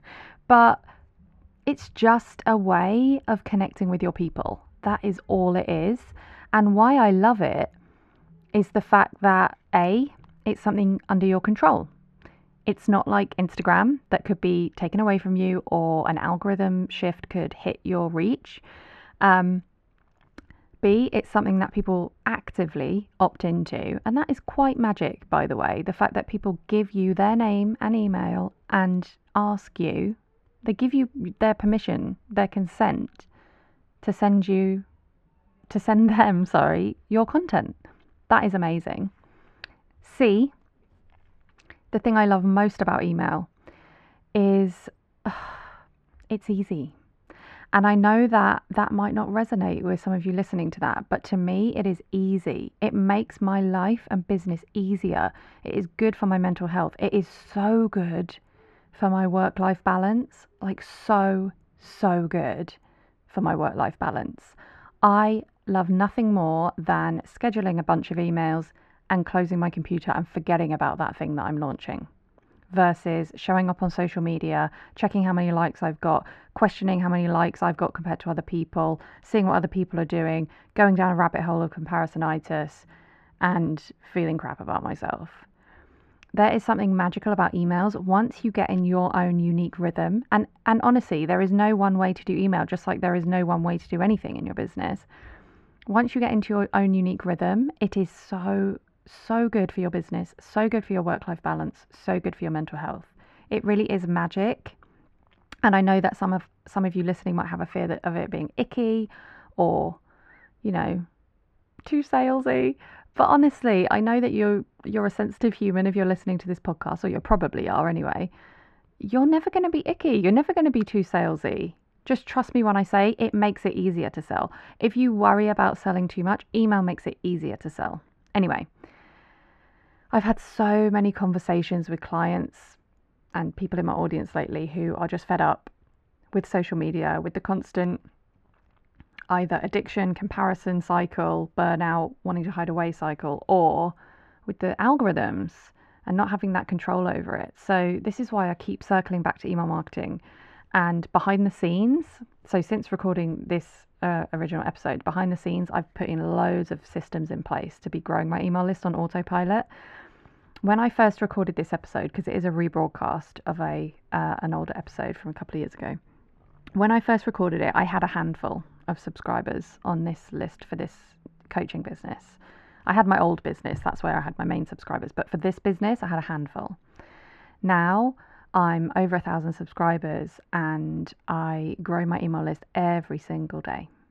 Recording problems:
muffled; very; fading above 1.5 kHz

